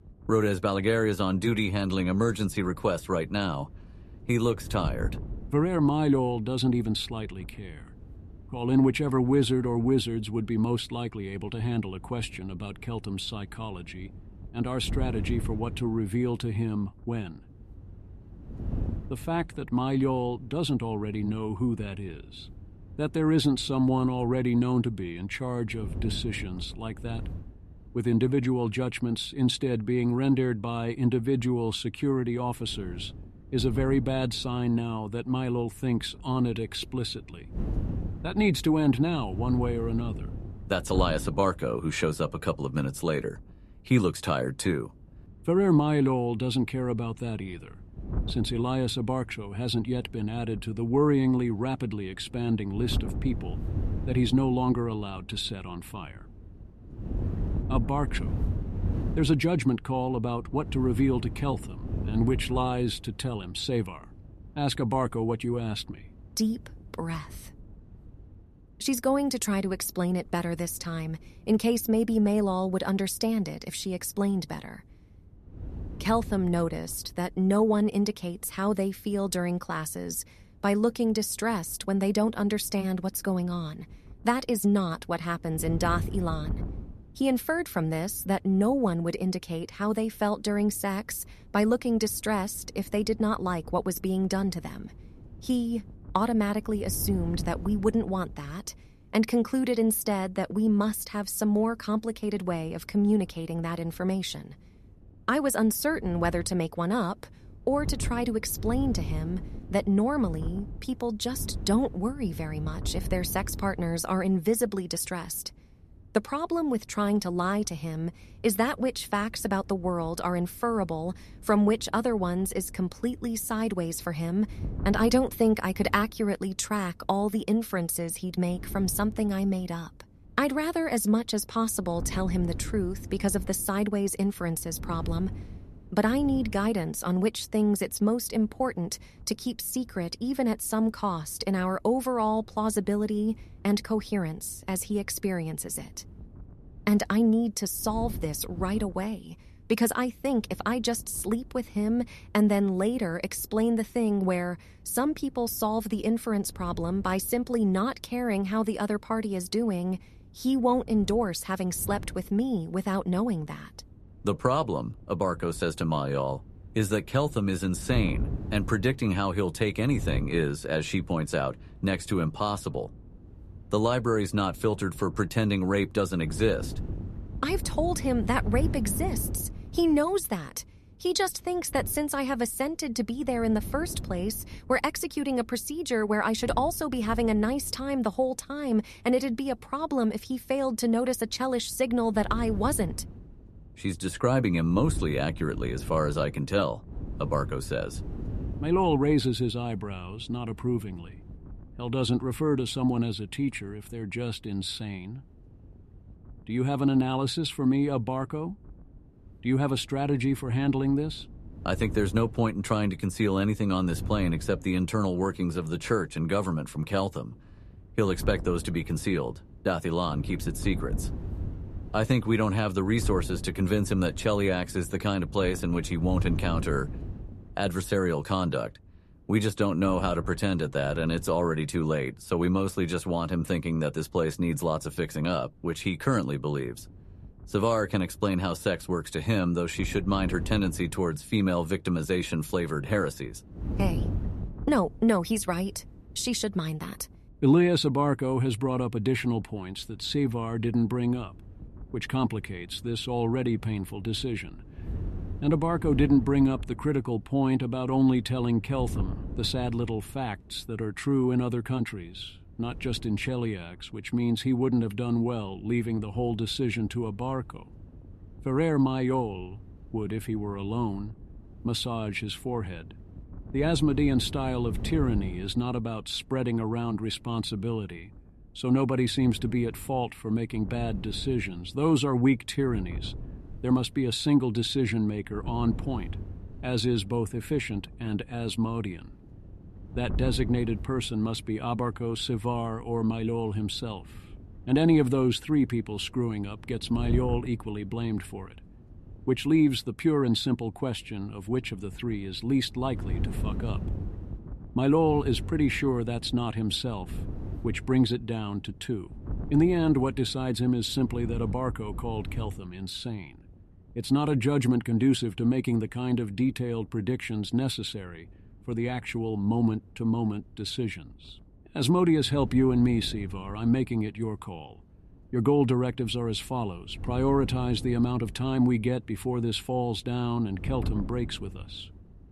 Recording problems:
wind noise on the microphone; occasional gusts; 20 dB below the speech

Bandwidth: 13.5 kHz